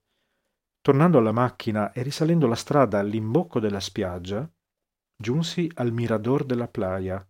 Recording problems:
none

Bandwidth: 16 kHz